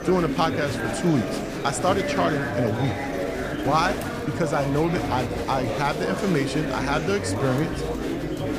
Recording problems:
murmuring crowd; loud; throughout; 2 dB below the speech

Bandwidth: 15 kHz